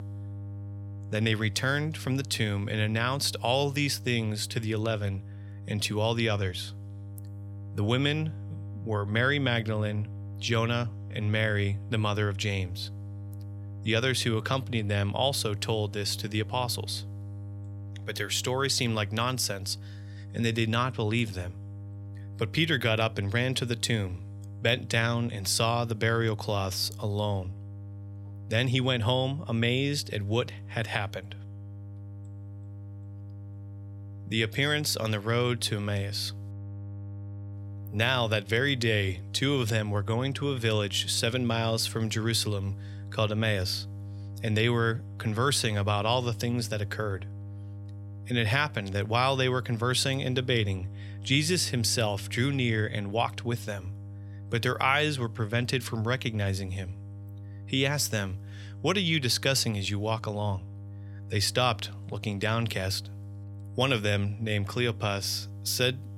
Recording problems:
electrical hum; faint; throughout; 50 Hz, 25 dB below the speech

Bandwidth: 16.5 kHz